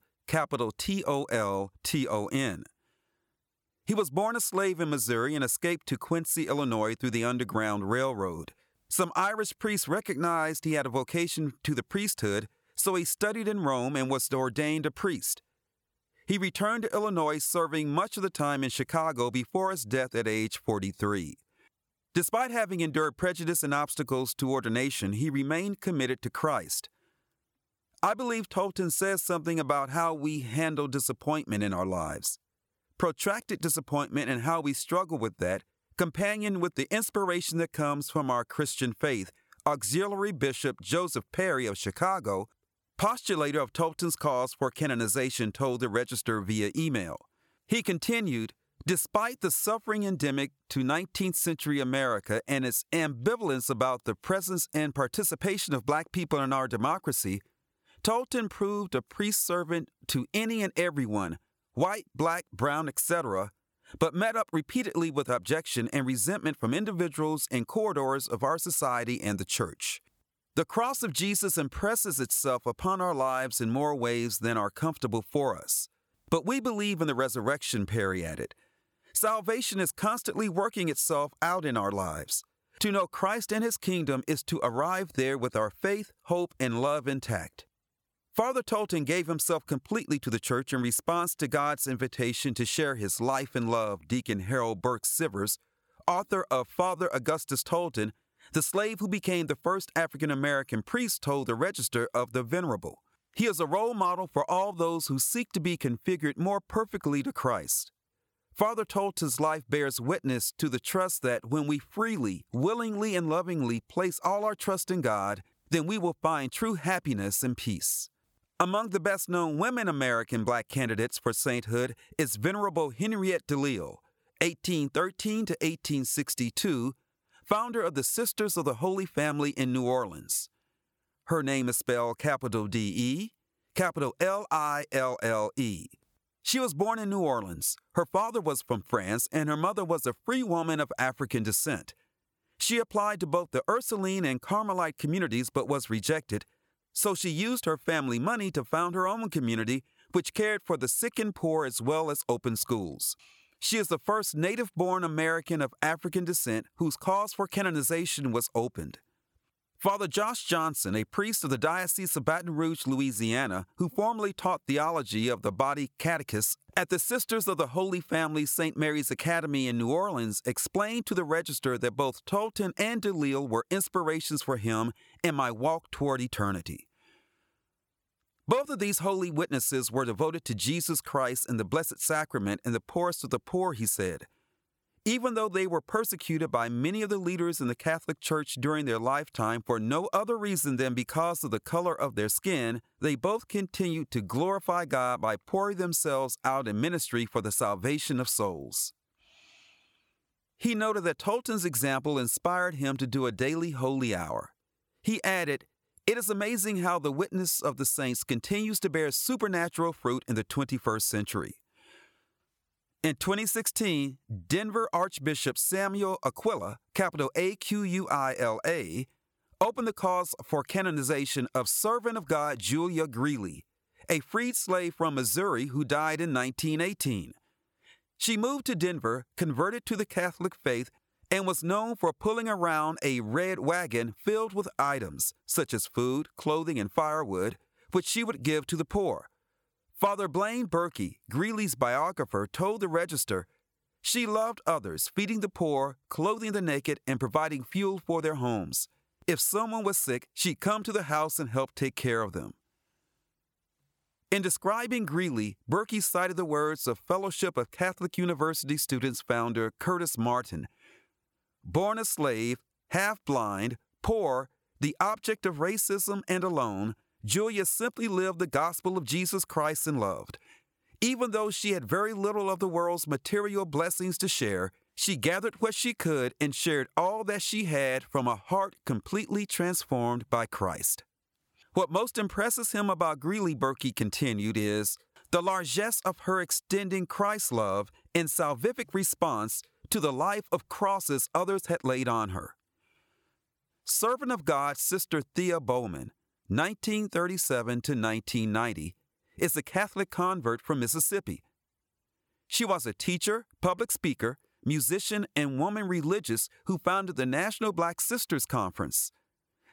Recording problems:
squashed, flat; somewhat

